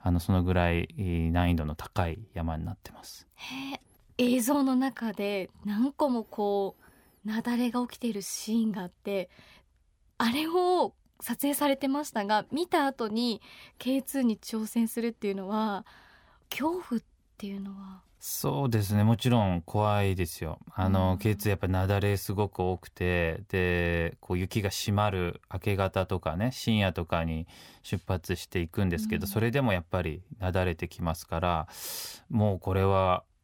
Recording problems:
none

